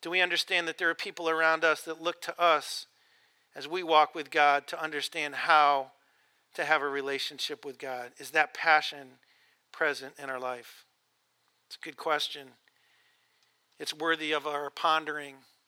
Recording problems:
thin; somewhat; fading below 450 Hz

